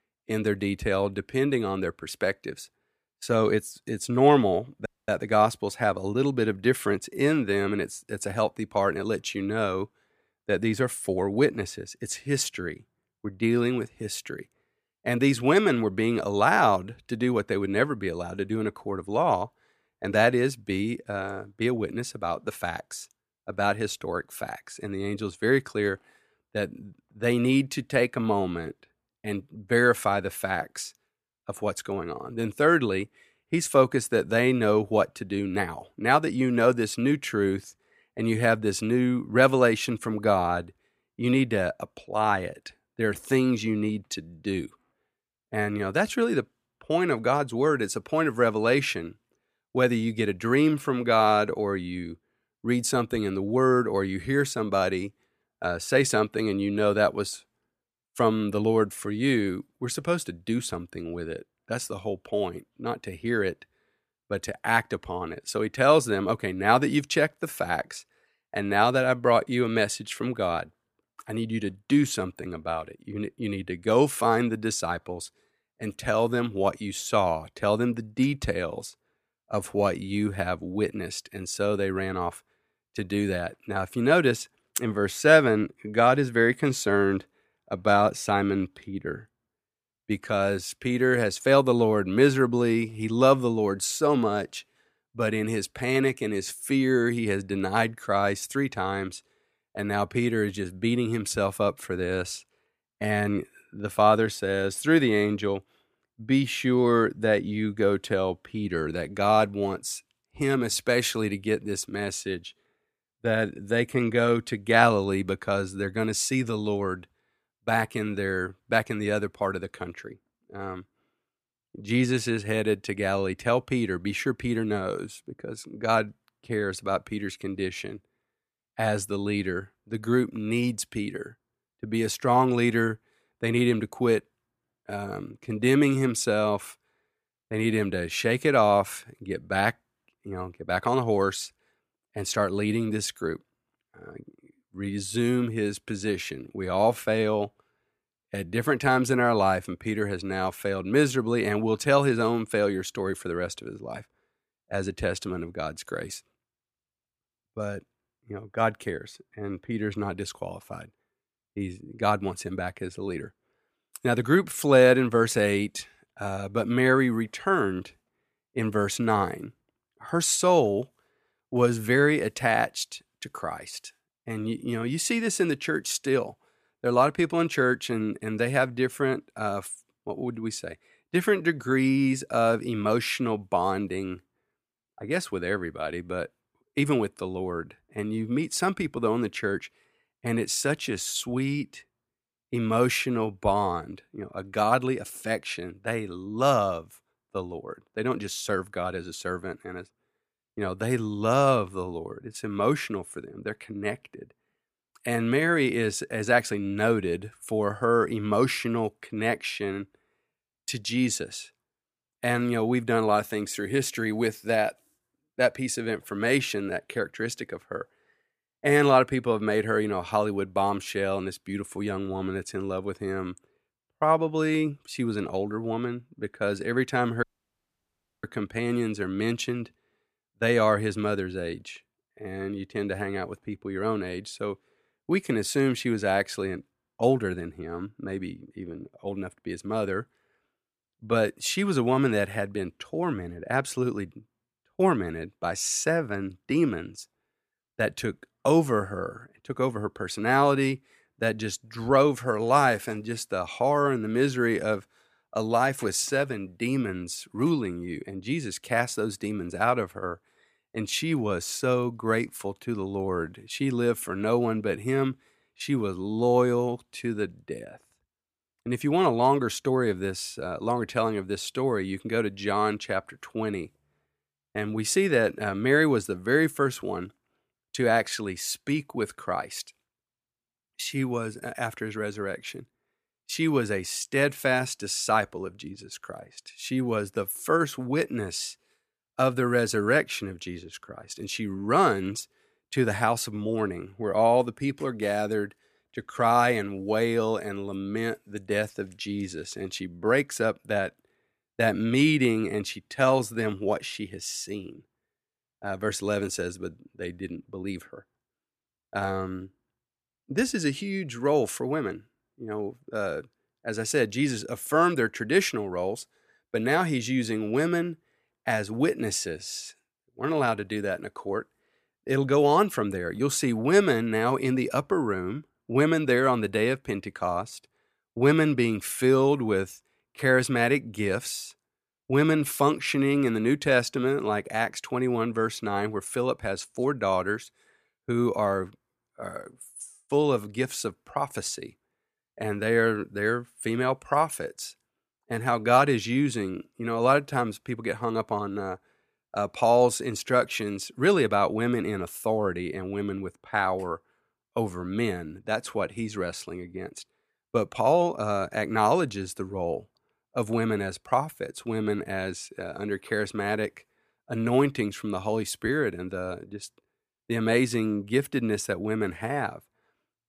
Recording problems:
audio cutting out; at 5 s and at 3:47 for 1 s

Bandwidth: 15 kHz